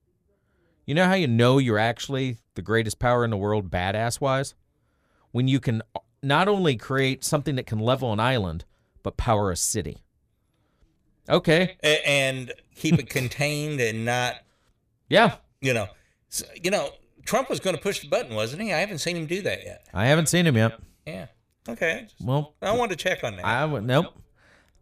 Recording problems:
echo of what is said; faint; from 11 s on; 80 ms later, 20 dB below the speech

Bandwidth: 15 kHz